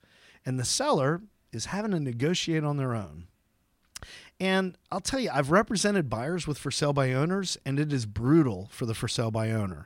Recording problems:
none

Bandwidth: 16 kHz